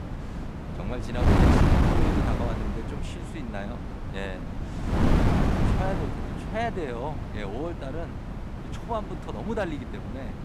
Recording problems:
wind noise on the microphone; heavy; 2 dB above the speech

